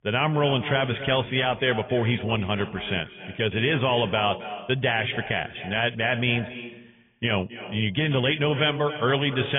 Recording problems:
garbled, watery; badly
high frequencies cut off; severe; nothing above 3.5 kHz
echo of what is said; noticeable; throughout; 270 ms later, 15 dB below the speech
abrupt cut into speech; at the end

